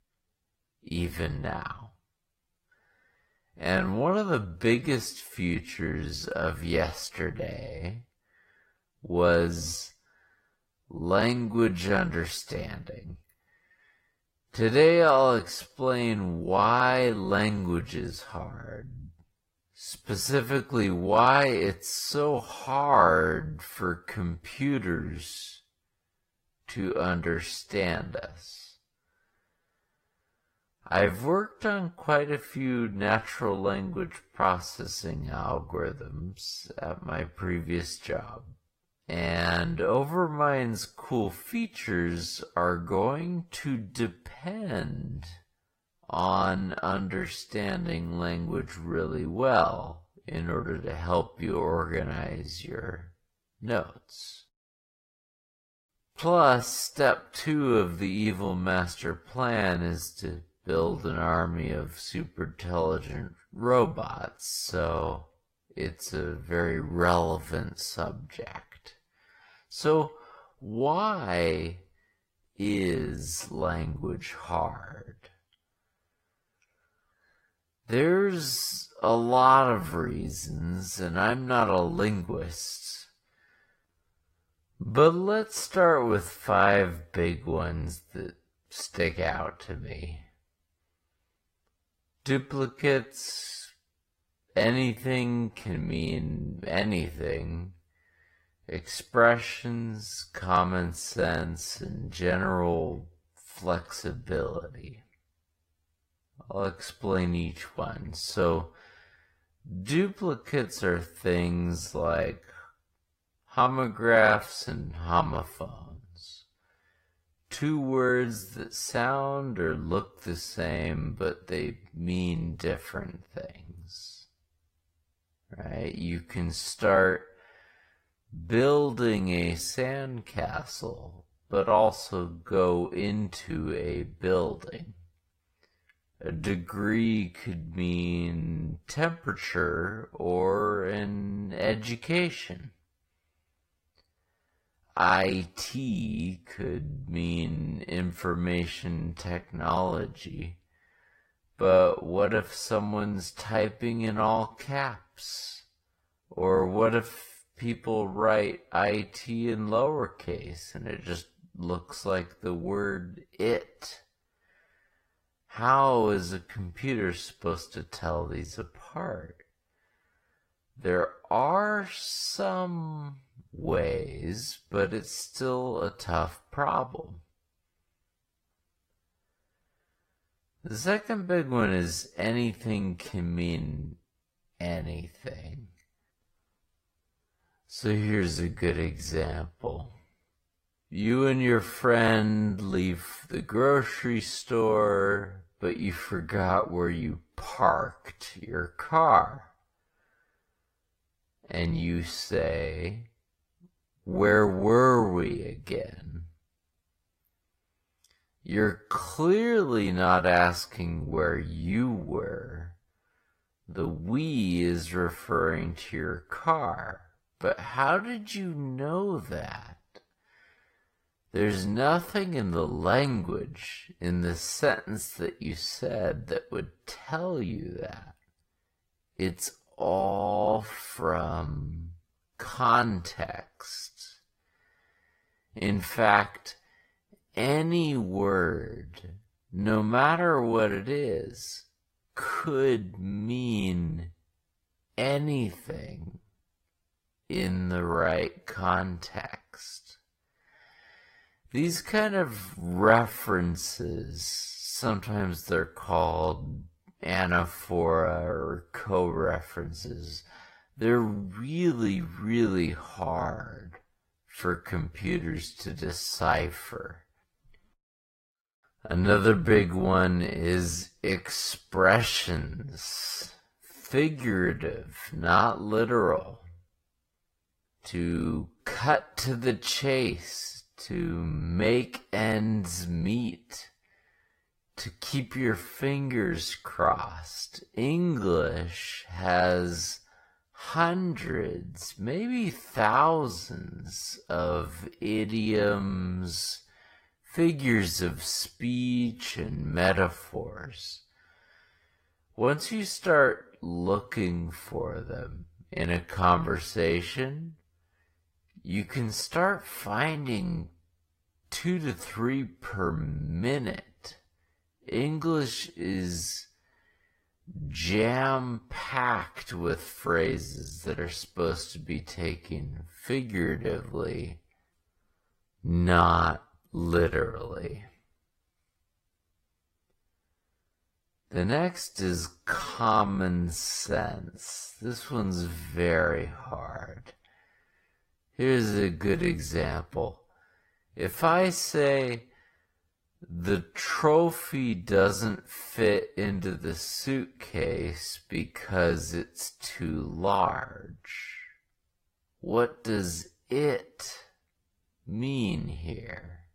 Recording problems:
wrong speed, natural pitch; too slow; 0.5 times normal speed
garbled, watery; slightly; nothing above 15.5 kHz

